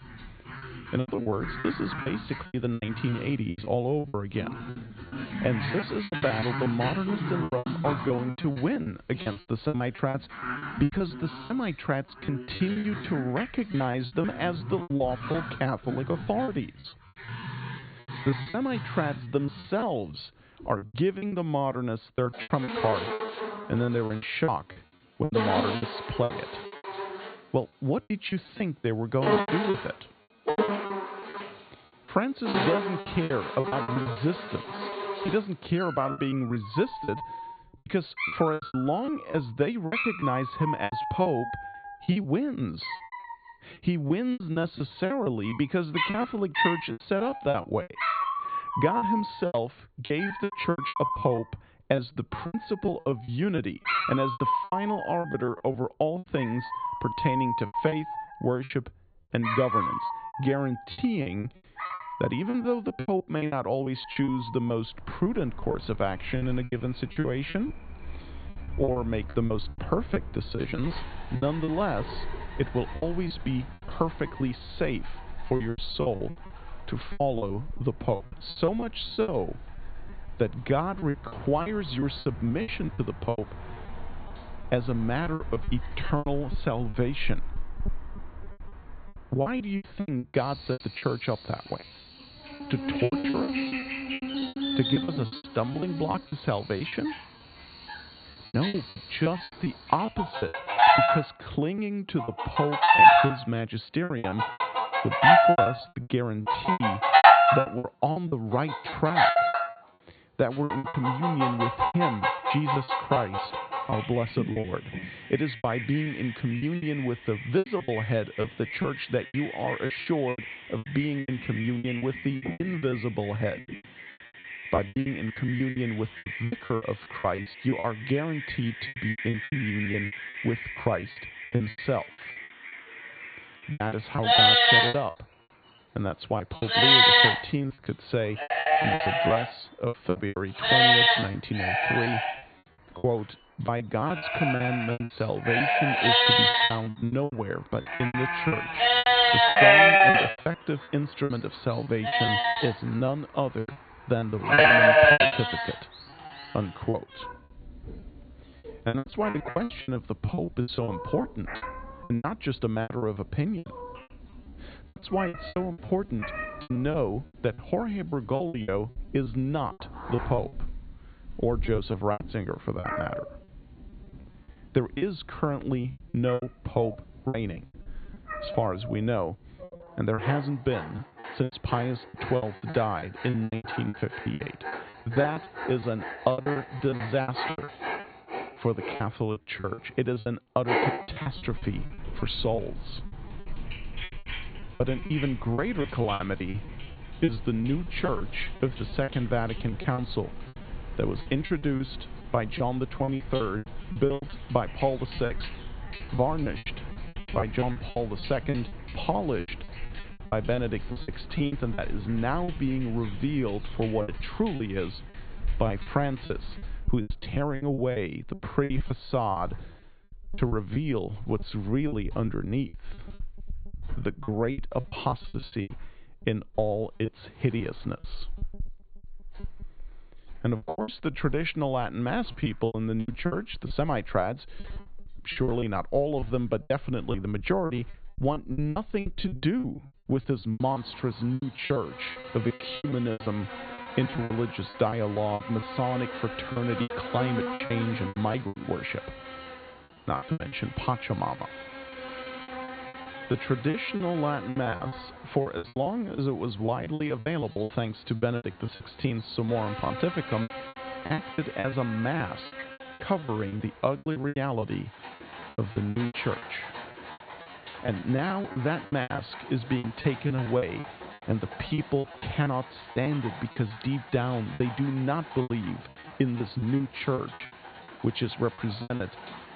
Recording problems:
high frequencies cut off; severe; nothing above 4.5 kHz
animal sounds; very loud; throughout; 3 dB above the speech
choppy; very; 16% of the speech affected

